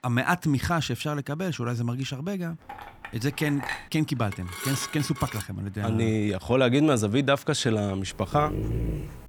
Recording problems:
rain or running water; faint; throughout; 30 dB below the speech
clattering dishes; noticeable; from 2.5 to 4 s and from 4.5 to 5.5 s; peak 6 dB below the speech
dog barking; noticeable; at 8.5 s; peak 3 dB below the speech

